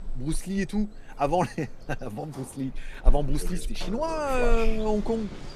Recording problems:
animal sounds; loud; throughout; 6 dB below the speech
household noises; noticeable; throughout; 10 dB below the speech

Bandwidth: 14.5 kHz